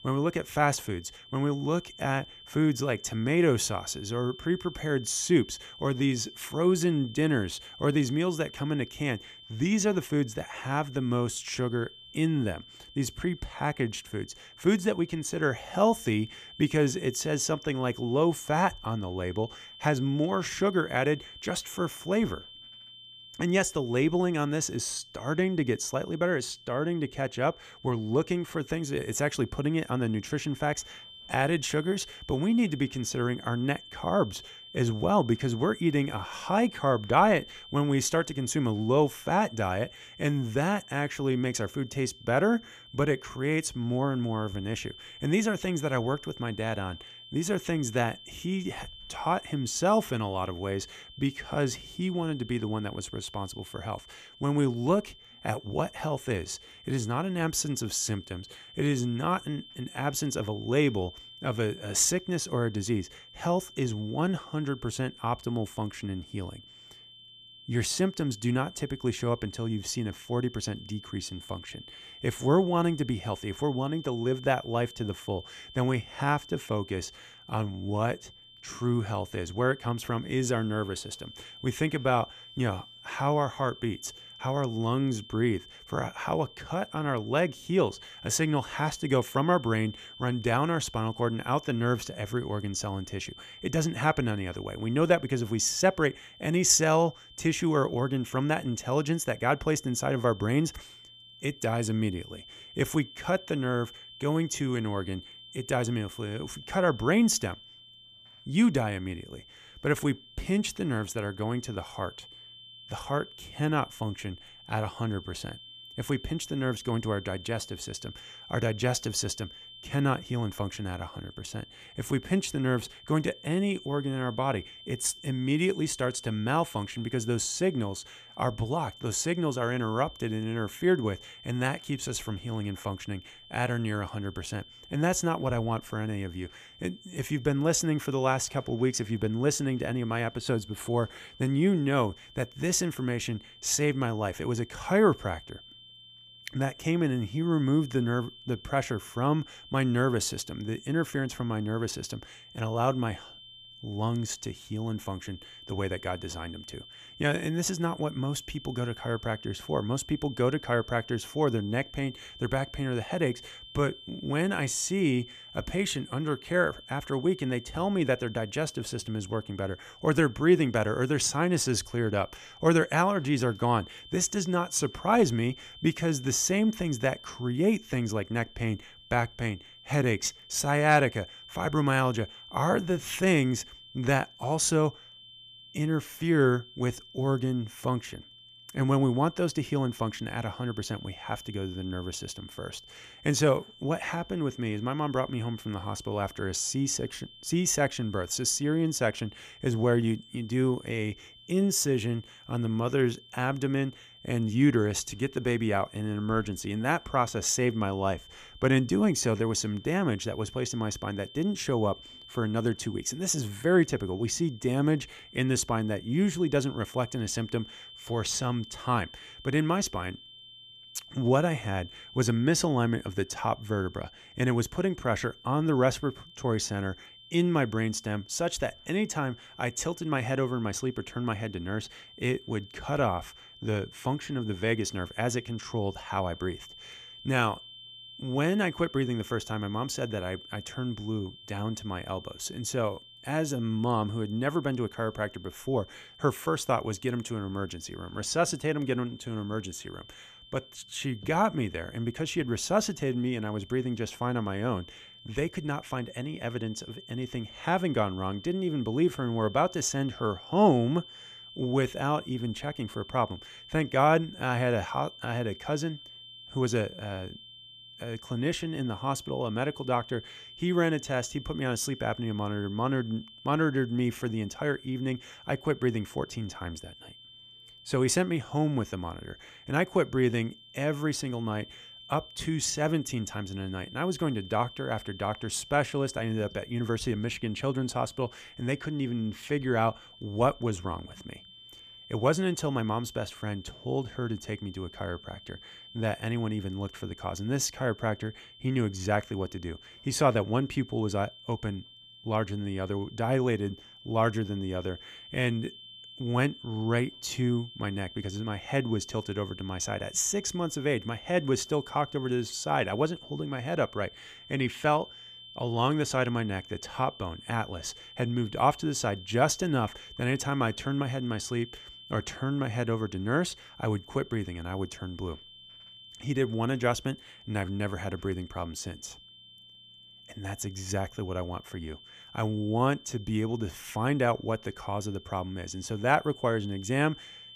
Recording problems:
high-pitched whine; noticeable; throughout; 3 kHz, 20 dB below the speech

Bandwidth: 14.5 kHz